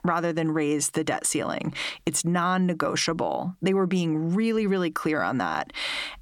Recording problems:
squashed, flat; heavily

